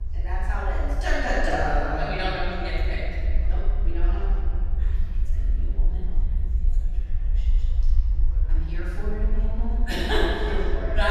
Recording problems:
room echo; strong; dies away in 3 s
off-mic speech; far
murmuring crowd; faint; throughout; 25 dB below the speech
low rumble; faint; throughout; 20 dB below the speech
abrupt cut into speech; at the end

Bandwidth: 14.5 kHz